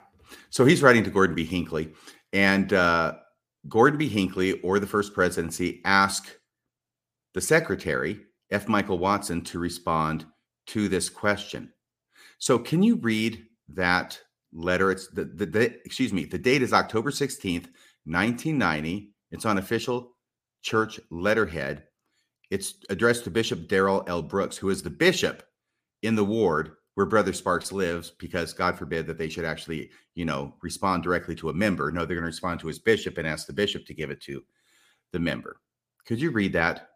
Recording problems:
none

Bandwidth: 15 kHz